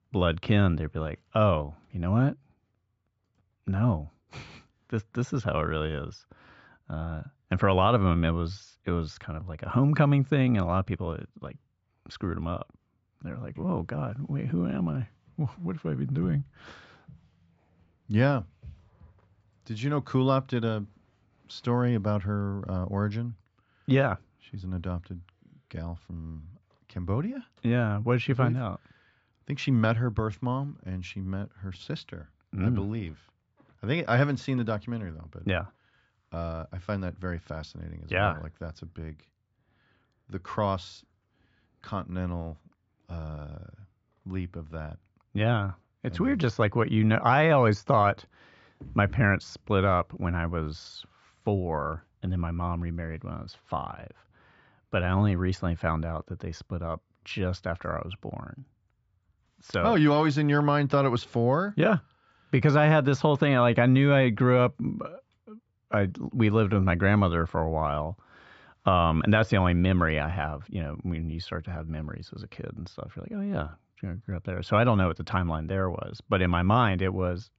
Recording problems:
high frequencies cut off; noticeable; nothing above 8 kHz
muffled; very slightly; fading above 3.5 kHz

